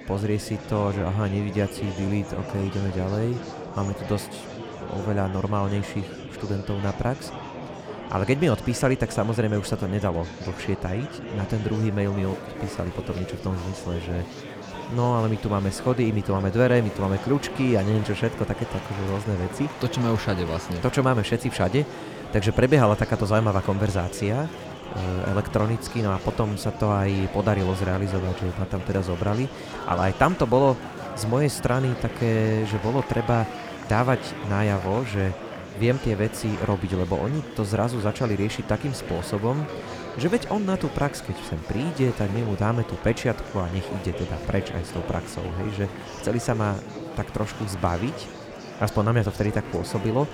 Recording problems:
murmuring crowd; noticeable; throughout; 10 dB below the speech

